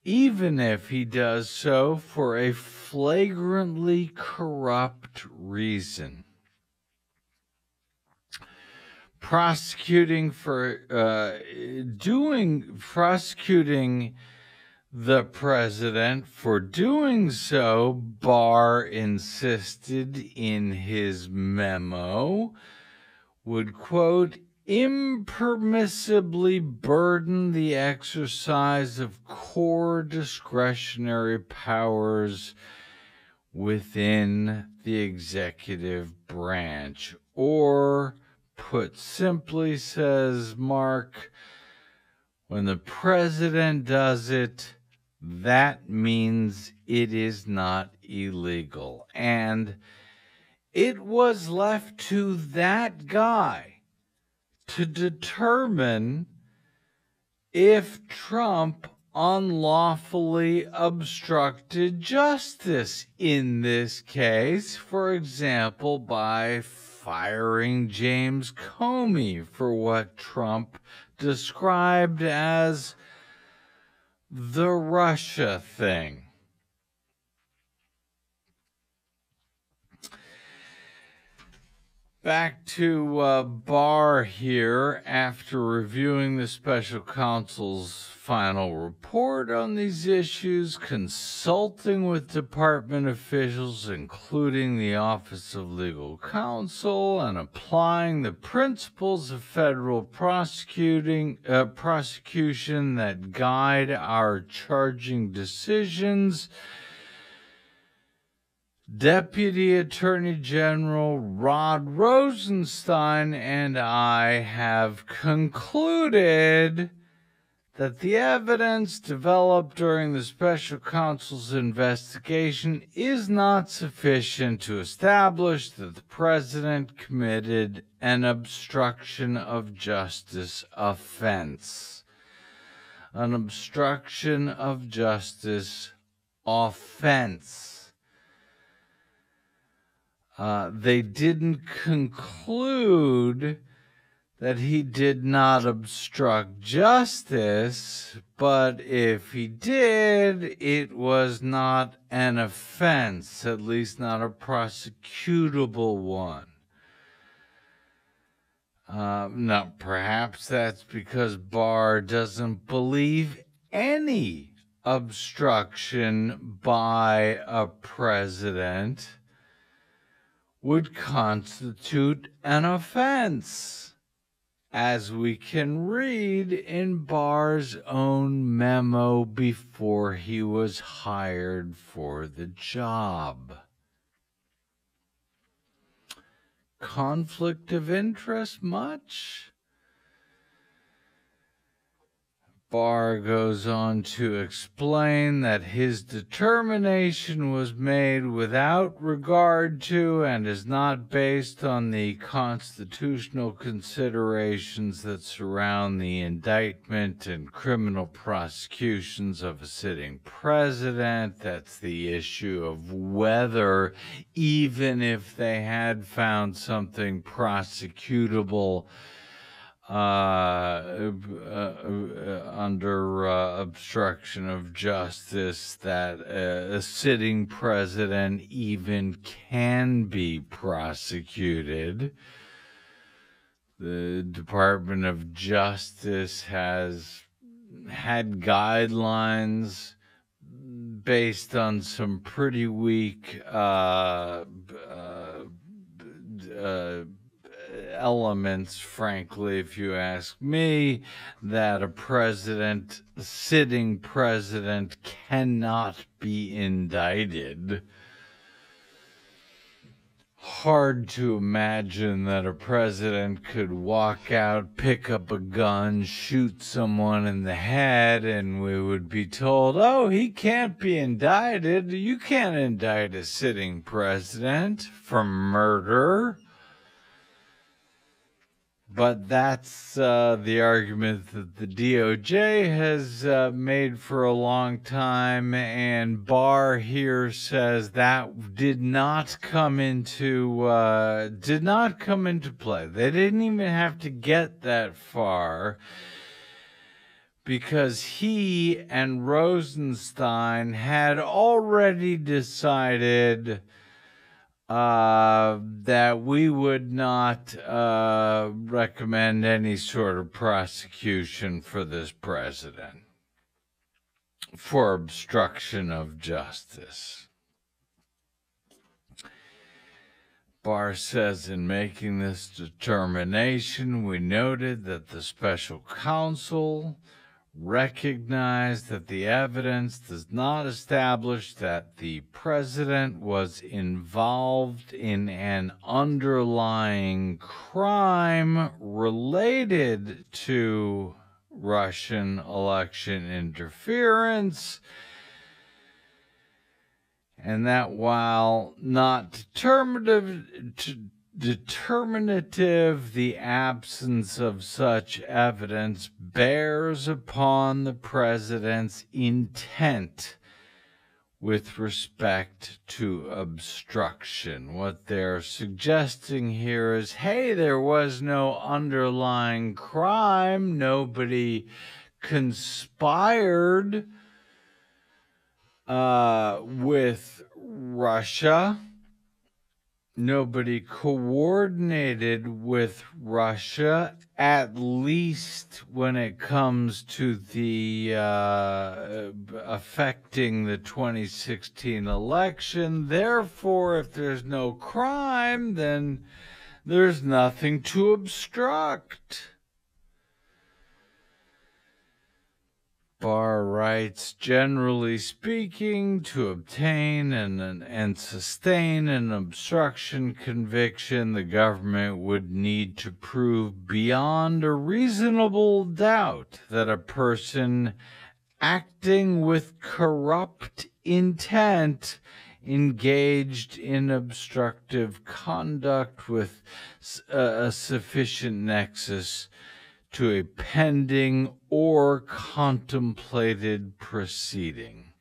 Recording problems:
wrong speed, natural pitch; too slow; 0.5 times normal speed

